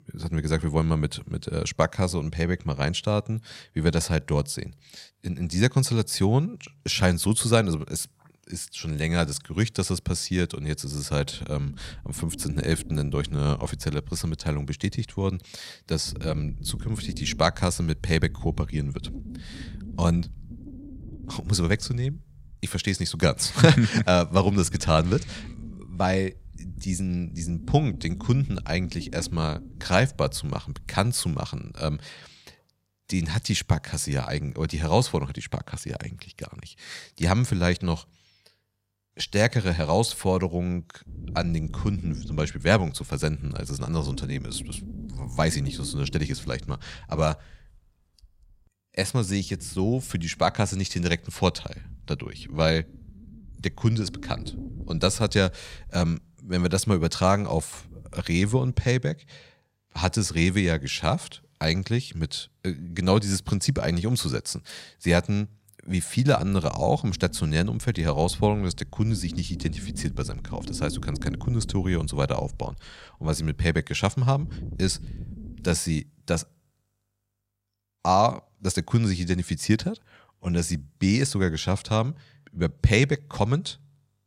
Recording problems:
wind noise on the microphone; occasional gusts; from 11 to 33 s, from 39 to 59 s and from 1:06 to 1:16; 20 dB below the speech

